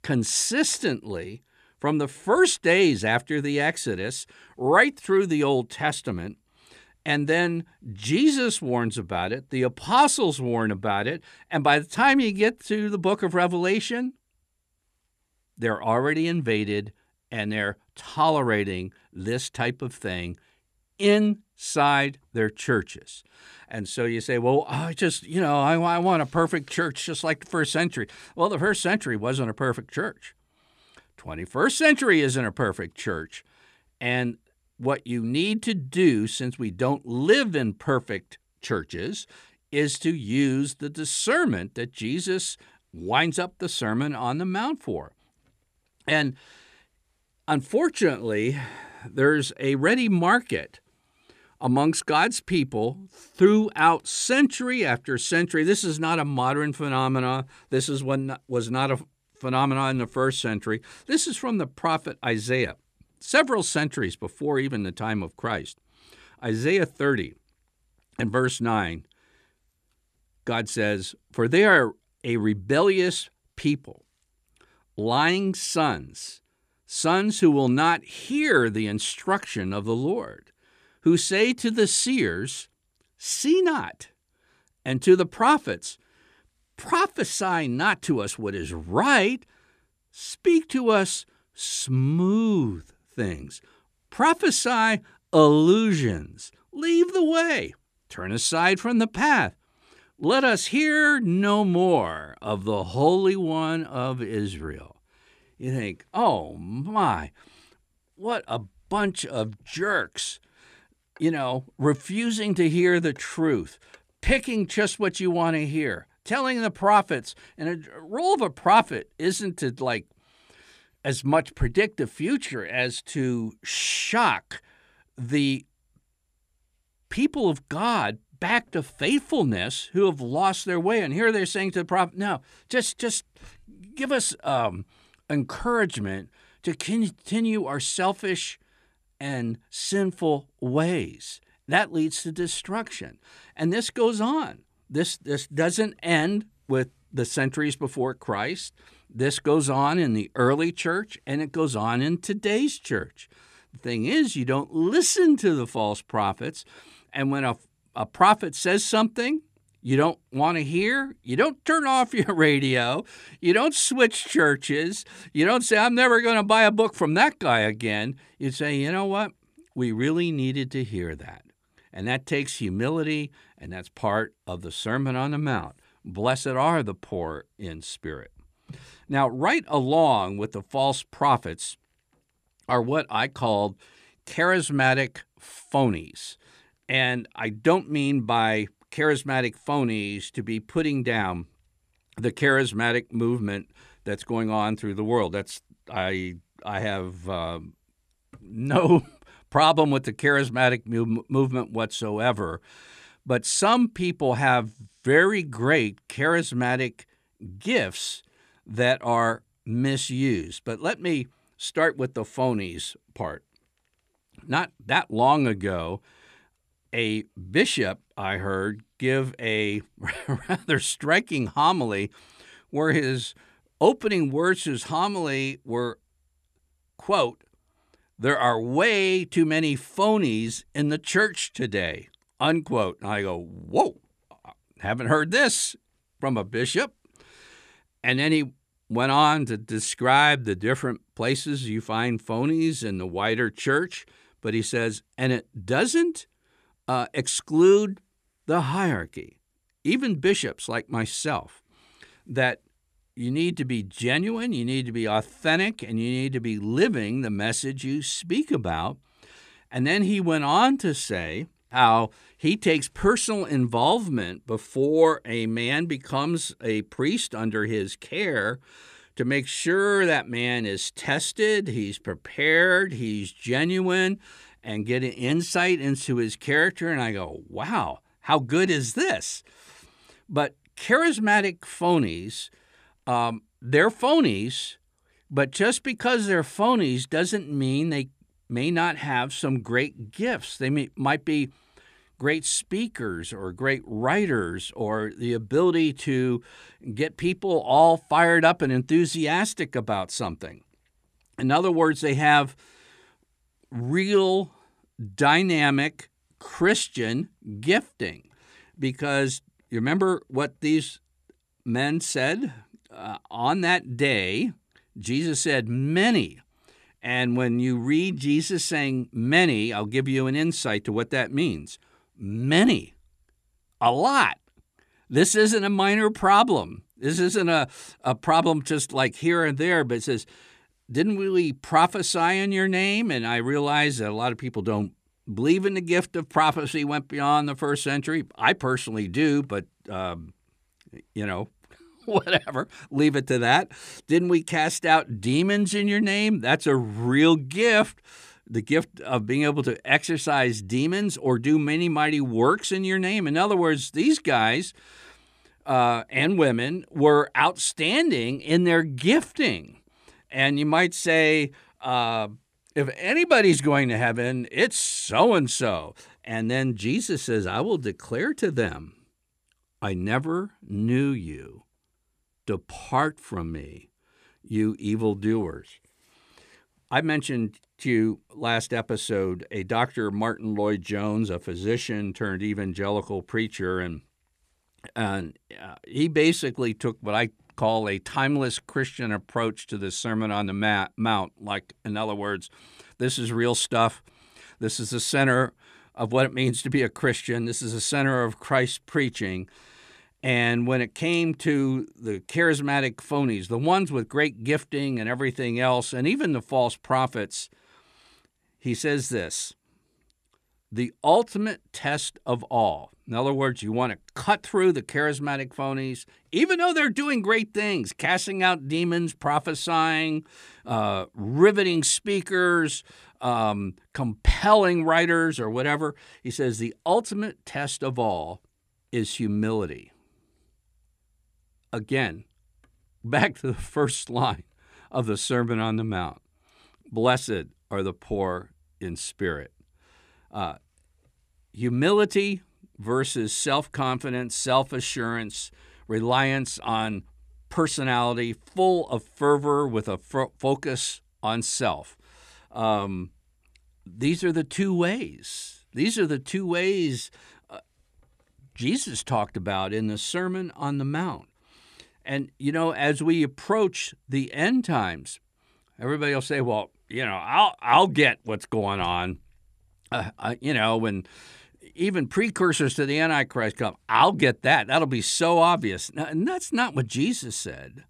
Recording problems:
none

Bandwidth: 14.5 kHz